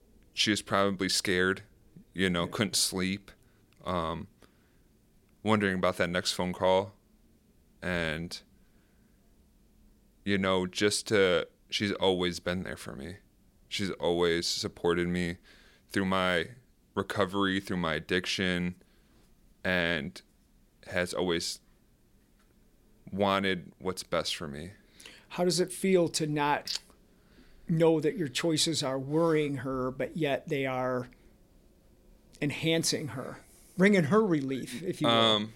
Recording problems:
none

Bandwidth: 16.5 kHz